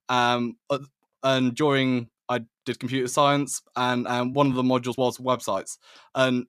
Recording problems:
uneven, jittery; strongly; from 0.5 to 5.5 s

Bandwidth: 14.5 kHz